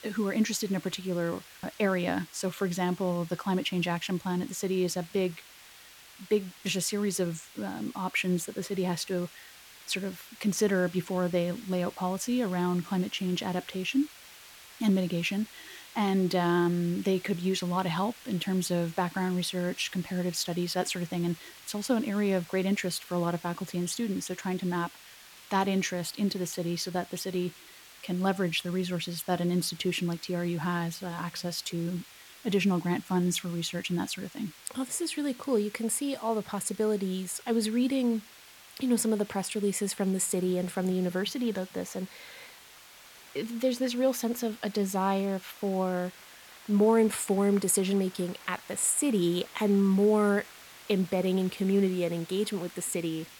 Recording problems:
hiss; noticeable; throughout; 20 dB below the speech
crowd noise; faint; throughout; 30 dB below the speech

